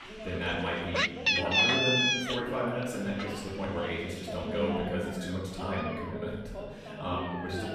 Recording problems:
off-mic speech; far
room echo; noticeable; dies away in 1.2 s
animal sounds; very loud; throughout; 6 dB above the speech
voice in the background; loud; throughout; 9 dB below the speech

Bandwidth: 14.5 kHz